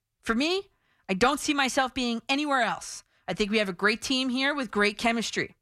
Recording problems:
none

